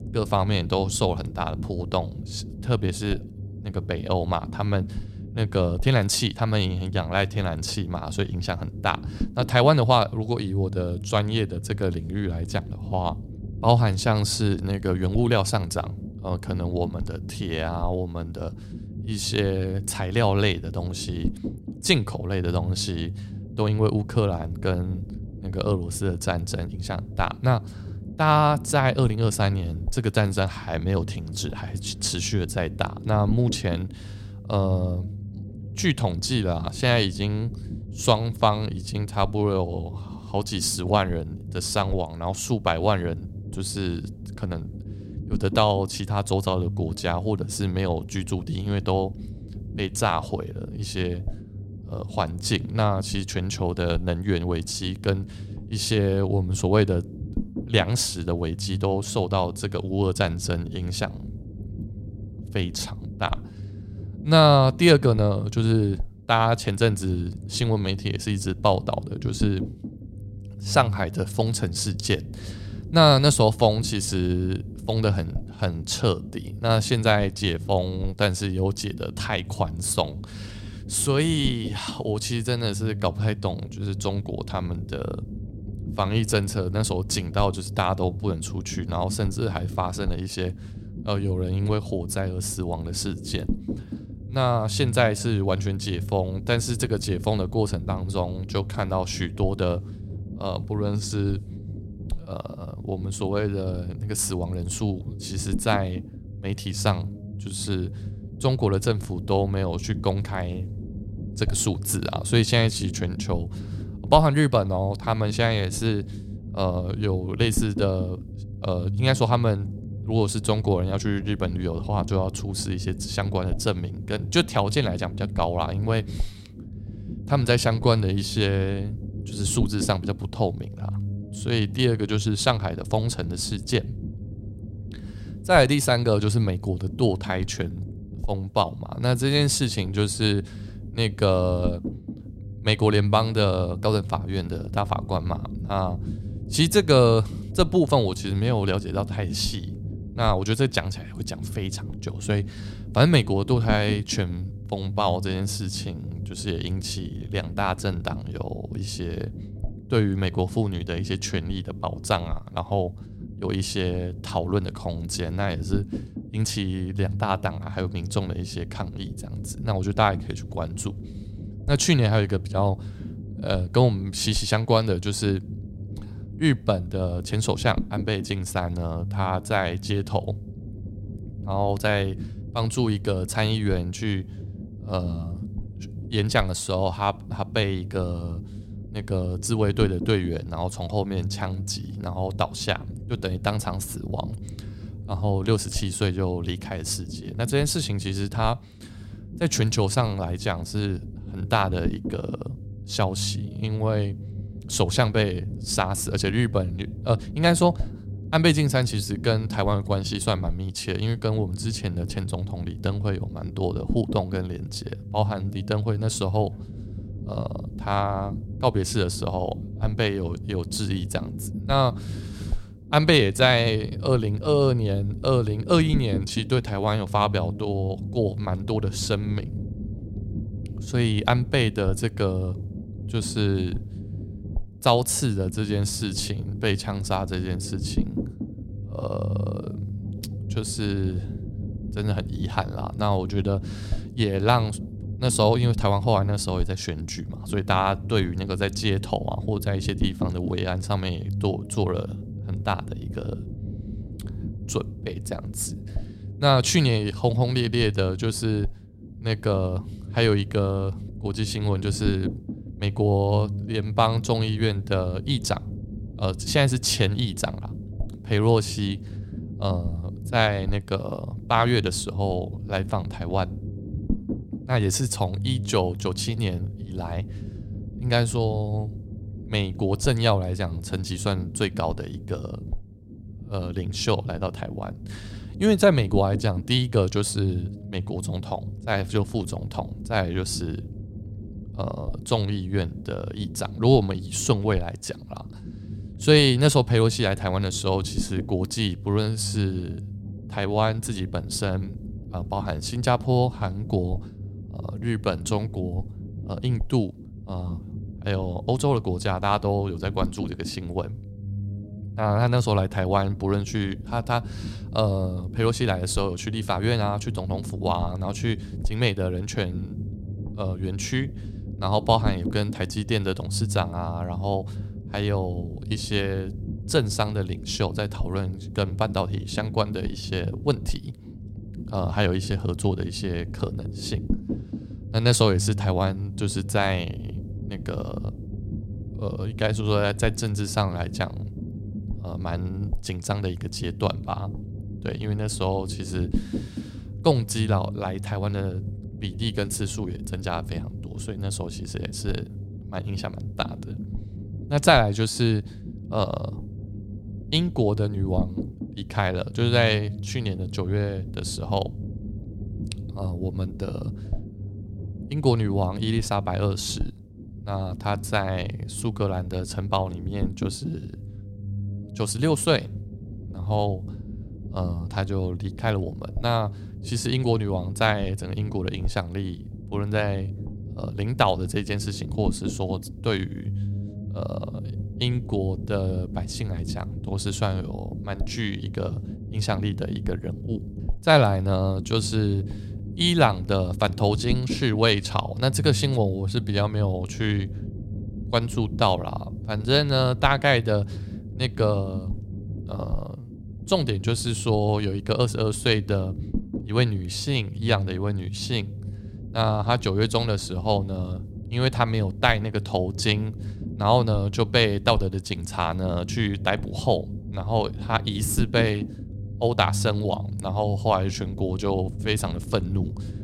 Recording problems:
low rumble; noticeable; throughout; 20 dB below the speech

